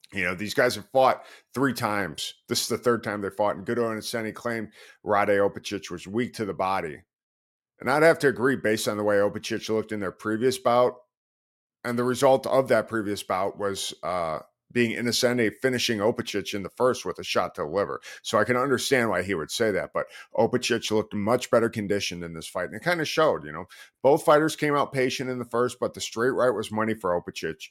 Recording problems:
none

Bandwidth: 16.5 kHz